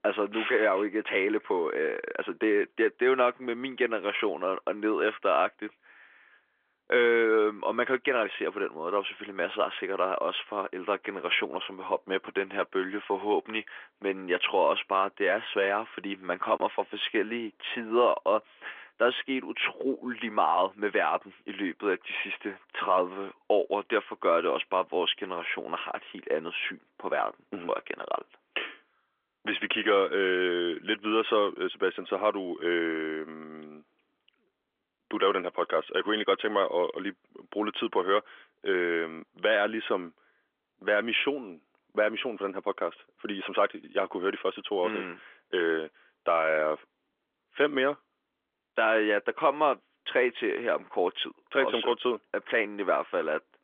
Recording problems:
phone-call audio; nothing above 3.5 kHz

